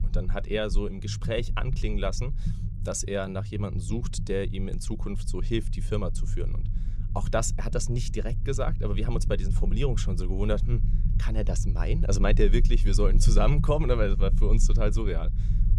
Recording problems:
low rumble; noticeable; throughout; 15 dB below the speech

